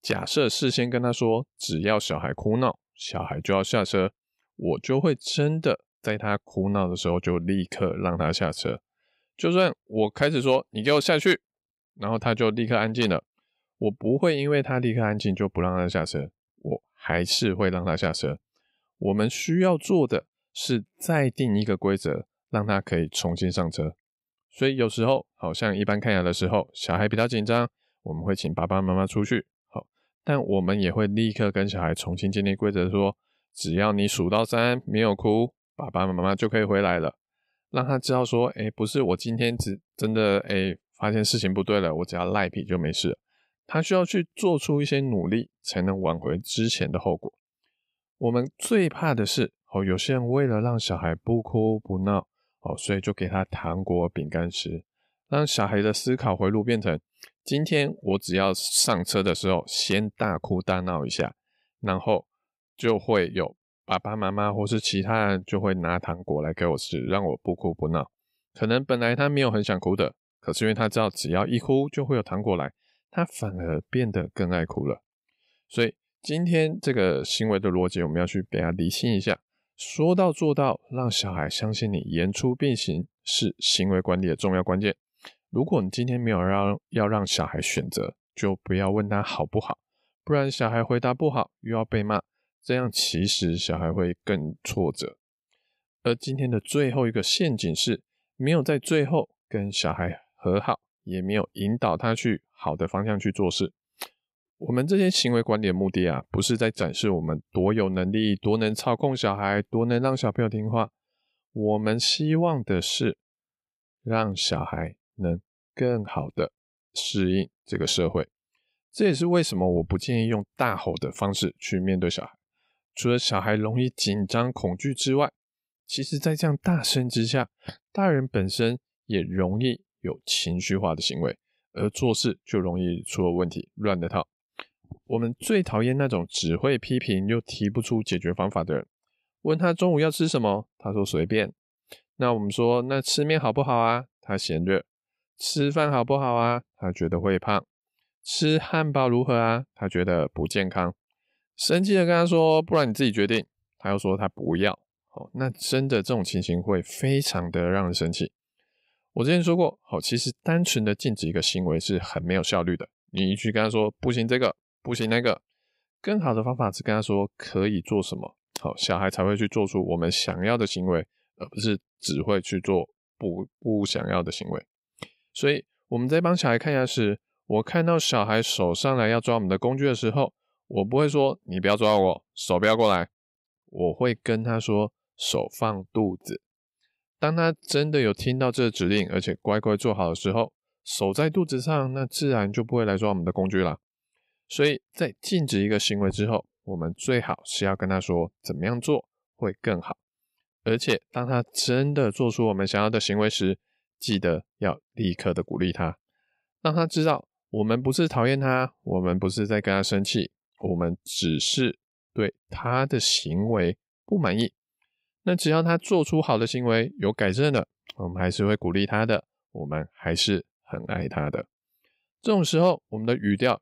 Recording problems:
none

